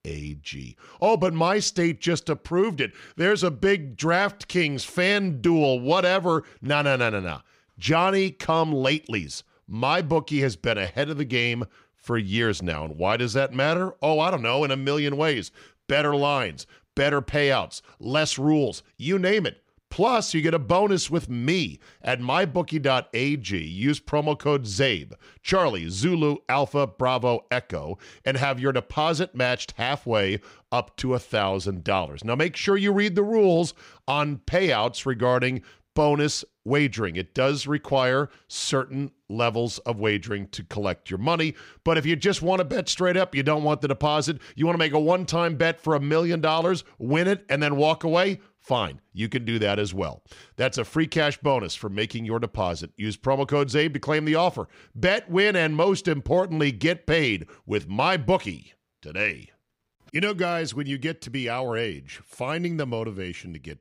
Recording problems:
none

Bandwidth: 15.5 kHz